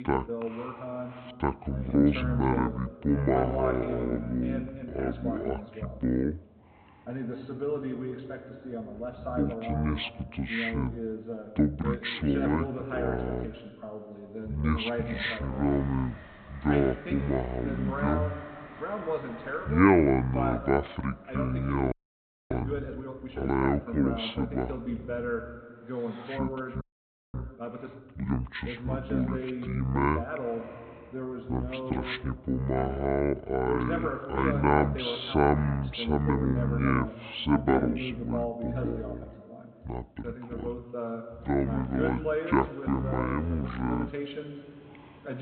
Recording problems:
high frequencies cut off; severe; nothing above 4 kHz
wrong speed and pitch; too slow and too low; 0.6 times normal speed
voice in the background; loud; throughout; 7 dB below the speech
train or aircraft noise; faint; throughout; 25 dB below the speech
audio freezing; at 22 s for 0.5 s and at 27 s for 0.5 s

